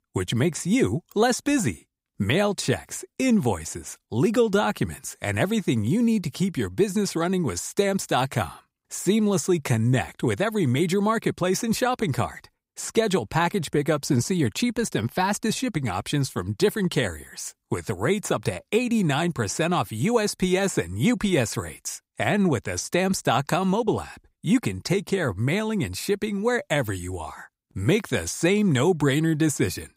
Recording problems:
none

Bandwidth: 15.5 kHz